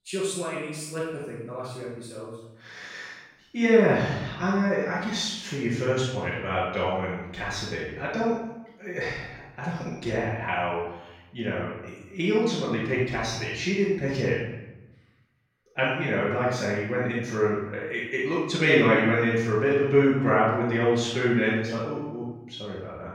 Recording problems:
room echo; strong; dies away in 0.8 s
off-mic speech; far

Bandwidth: 16.5 kHz